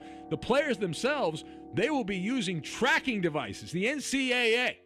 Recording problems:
background music; faint; throughout; 20 dB below the speech

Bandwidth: 13.5 kHz